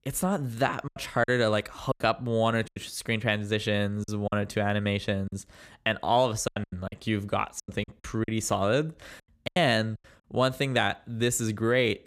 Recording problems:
choppy; very; from 1 to 3 s, from 4 to 5.5 s and from 6.5 to 9.5 s; 11% of the speech affected

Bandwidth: 15 kHz